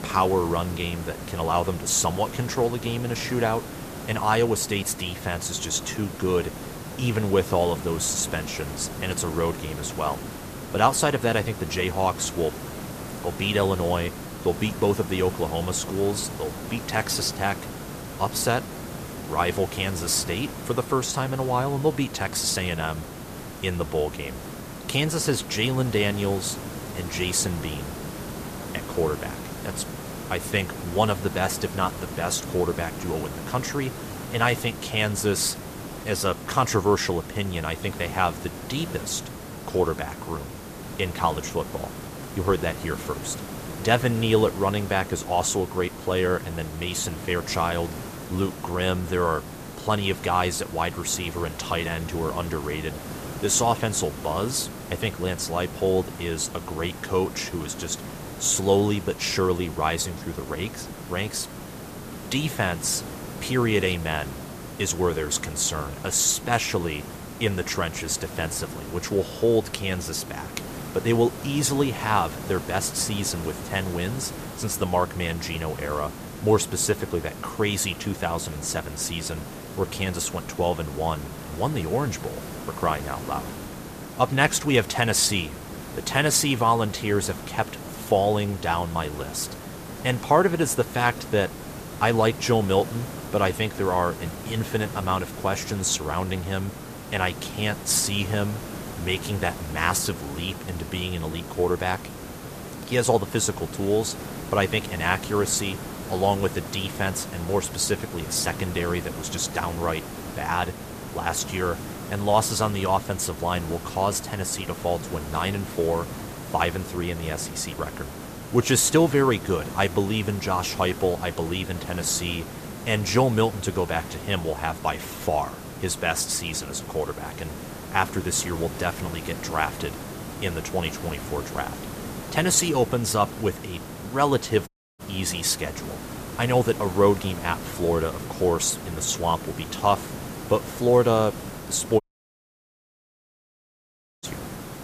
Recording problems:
hiss; noticeable; throughout; 10 dB below the speech
audio cutting out; at 2:15 and at 2:22 for 2 s

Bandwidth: 14.5 kHz